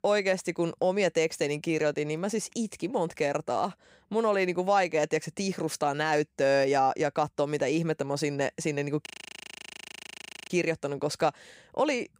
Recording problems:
audio freezing; at 9 s for 1.5 s

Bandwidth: 15.5 kHz